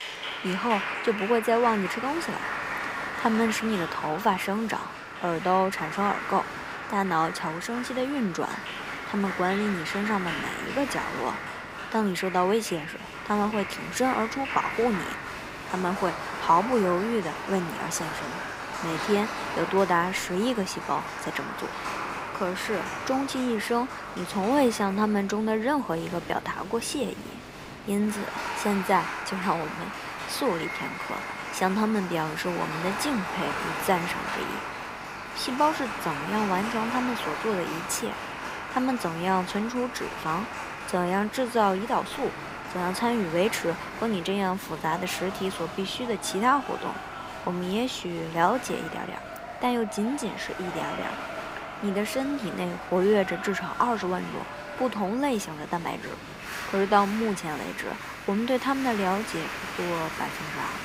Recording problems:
crowd noise; loud; throughout; 6 dB below the speech
electrical hum; faint; from 13 s on; 50 Hz, 30 dB below the speech

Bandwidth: 15.5 kHz